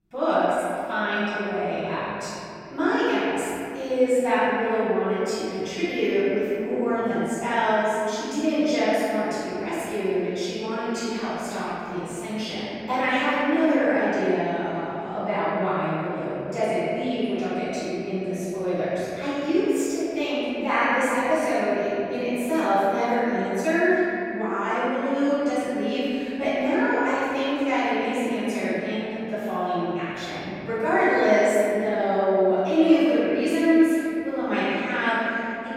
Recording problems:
room echo; strong; dies away in 2.8 s
off-mic speech; far

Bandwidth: 16.5 kHz